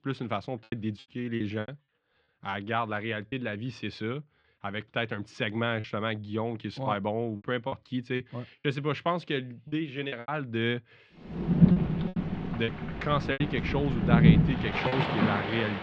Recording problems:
muffled; very; fading above 3.5 kHz
rain or running water; very loud; from 11 s on; 5 dB above the speech
choppy; very; 7% of the speech affected

